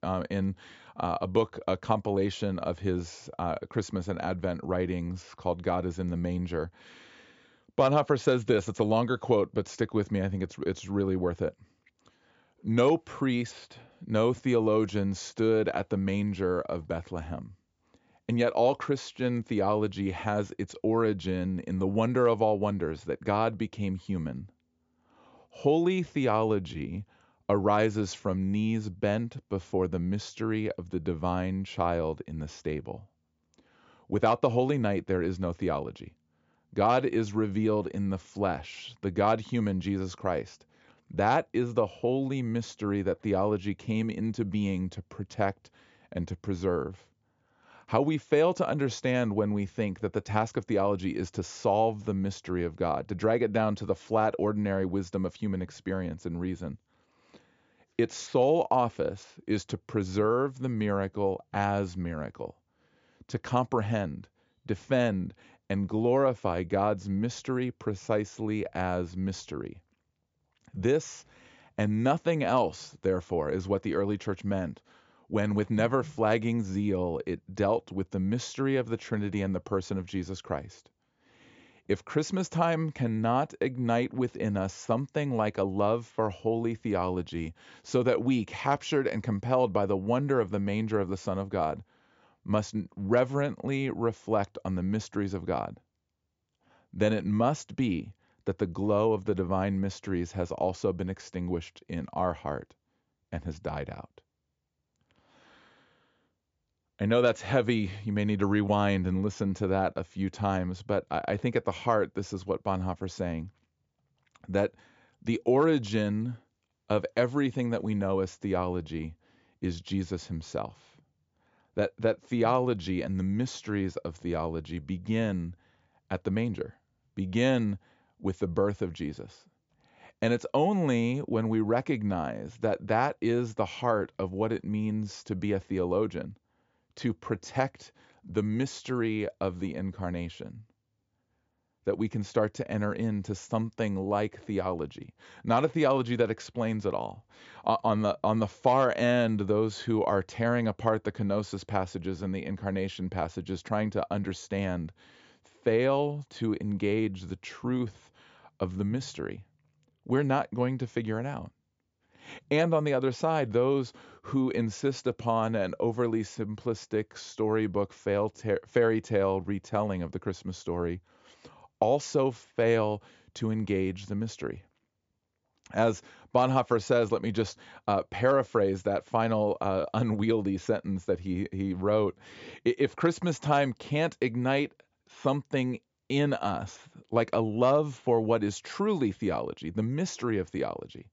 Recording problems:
high frequencies cut off; noticeable; nothing above 7.5 kHz

